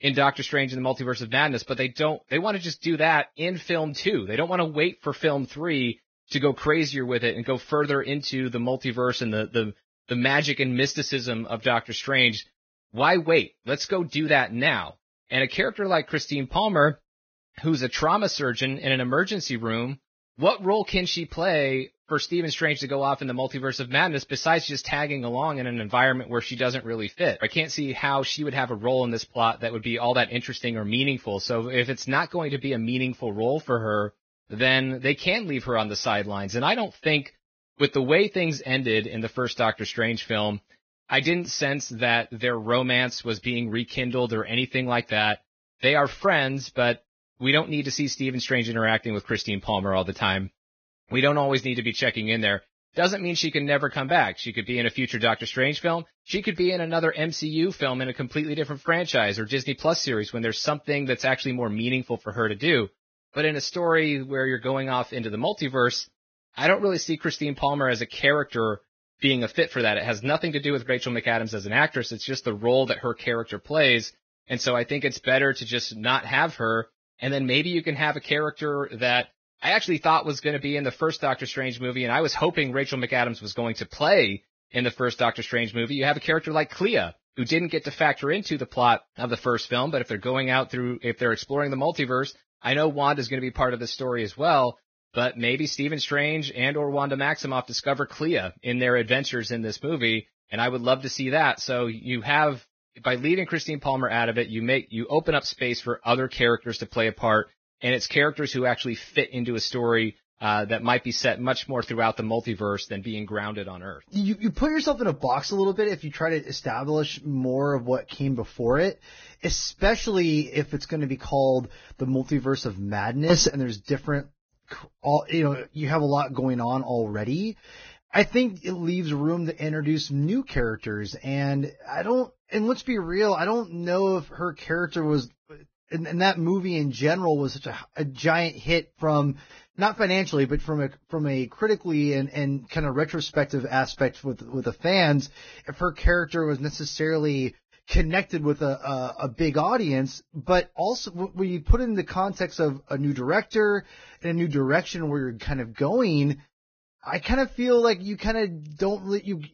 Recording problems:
garbled, watery; badly; nothing above 6.5 kHz

